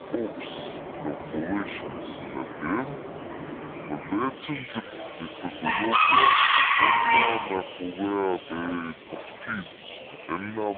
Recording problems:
phone-call audio; poor line
wrong speed and pitch; too slow and too low; 0.6 times normal speed
animal sounds; very loud; throughout; 10 dB above the speech
chatter from many people; noticeable; throughout; 15 dB below the speech
abrupt cut into speech; at the end

